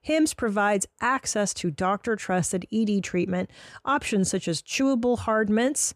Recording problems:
none

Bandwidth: 14.5 kHz